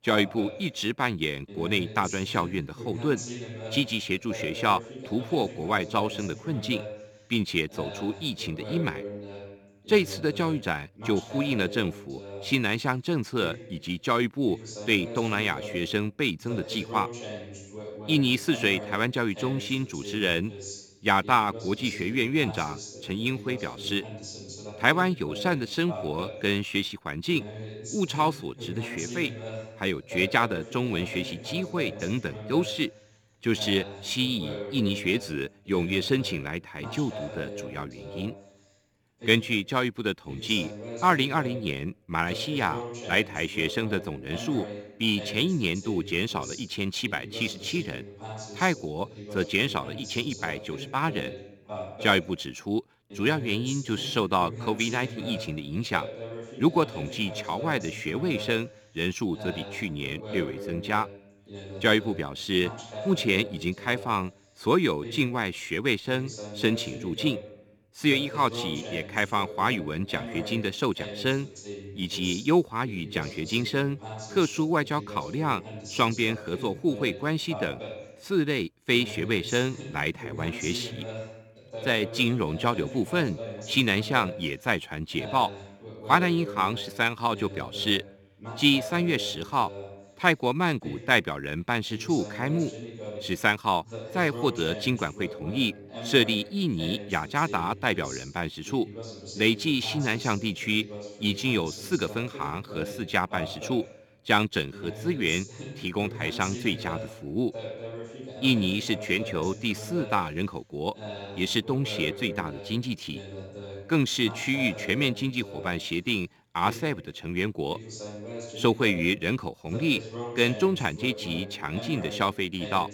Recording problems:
voice in the background; noticeable; throughout; 10 dB below the speech

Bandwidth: 18.5 kHz